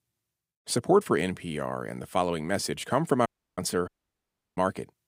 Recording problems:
audio cutting out; at 3.5 s and at 4 s for 0.5 s

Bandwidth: 15.5 kHz